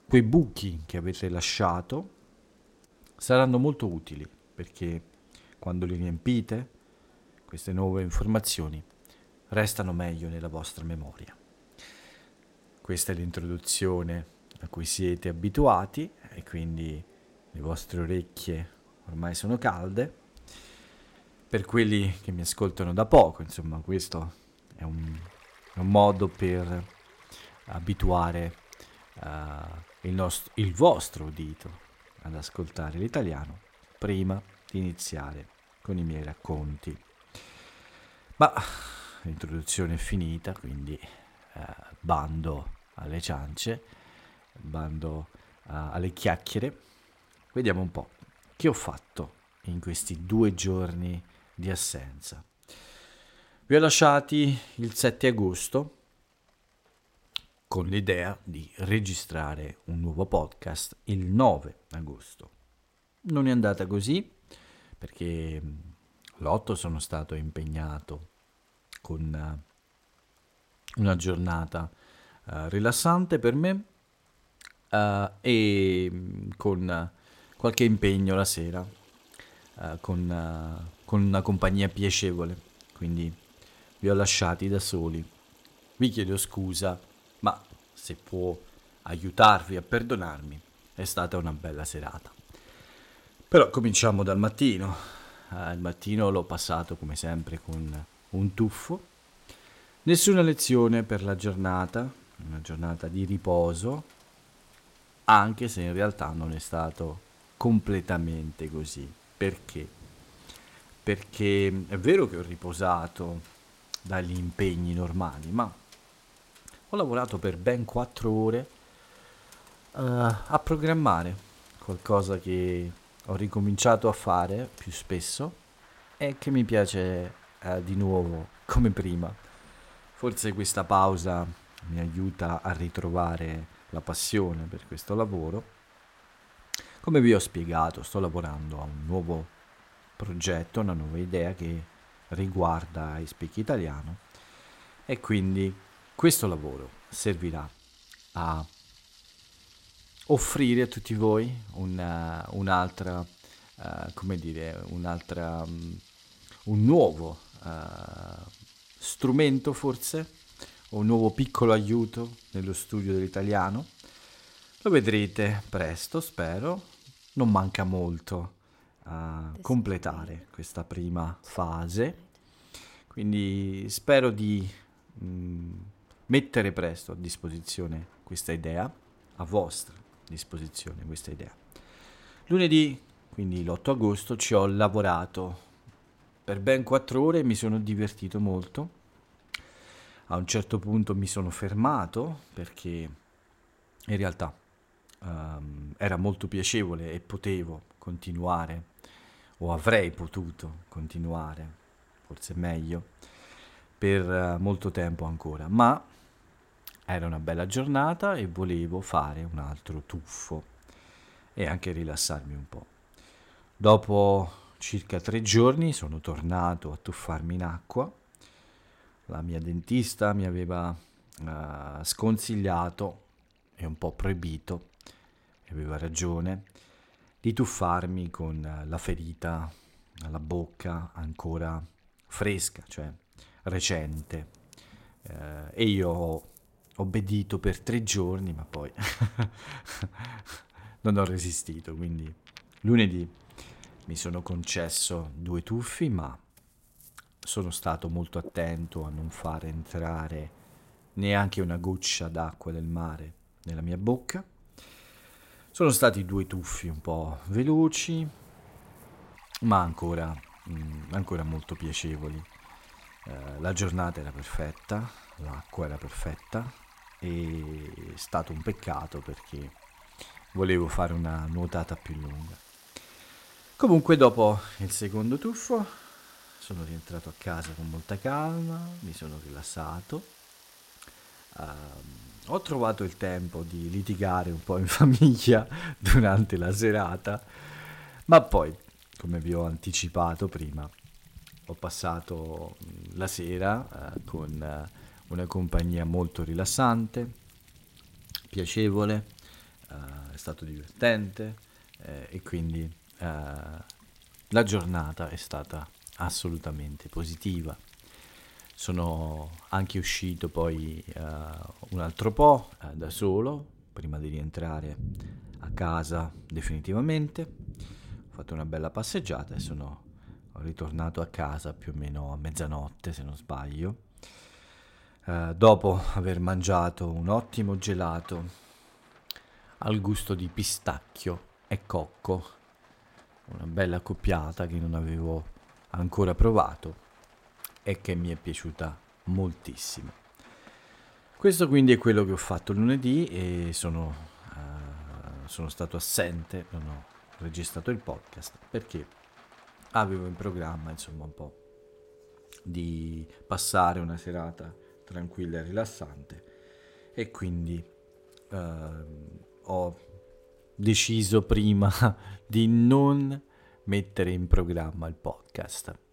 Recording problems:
rain or running water; faint; throughout; 25 dB below the speech

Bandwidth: 16 kHz